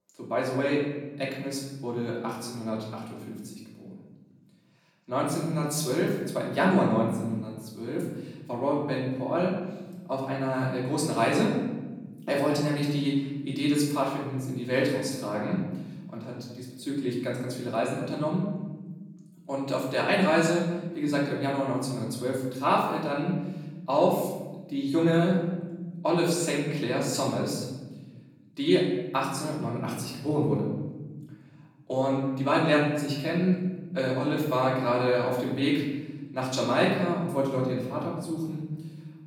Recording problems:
off-mic speech; far
room echo; noticeable; dies away in 1.3 s

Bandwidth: 18.5 kHz